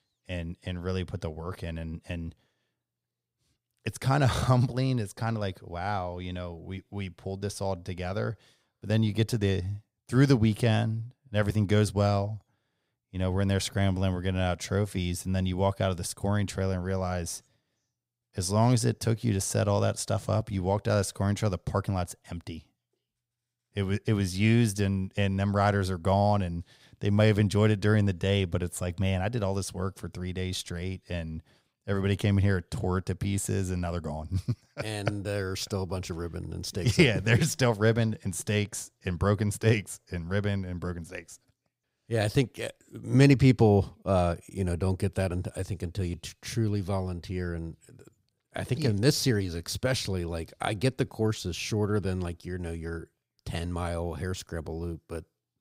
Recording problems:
none

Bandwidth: 15.5 kHz